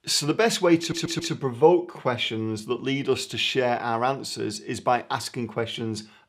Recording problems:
audio stuttering; at 1 s

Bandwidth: 15.5 kHz